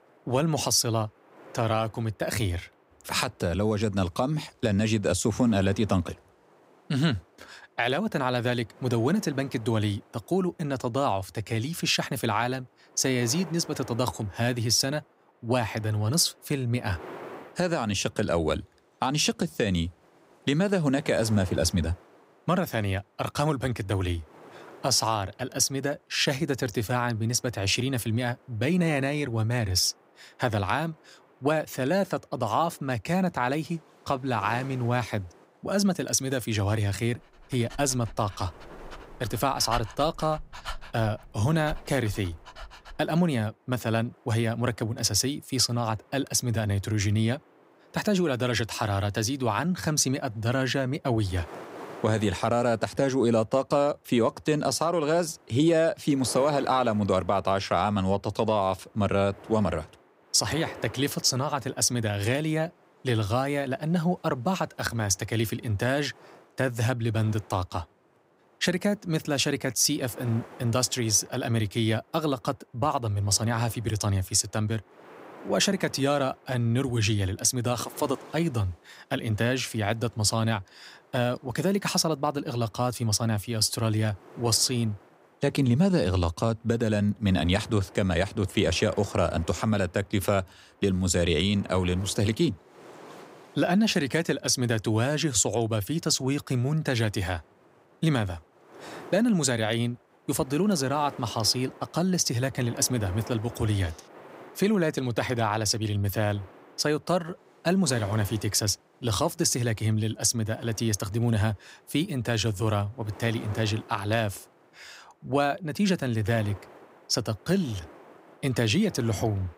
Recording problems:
wind noise on the microphone; occasional gusts; 20 dB below the speech
dog barking; noticeable; from 38 to 43 s; peak 9 dB below the speech

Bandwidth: 15.5 kHz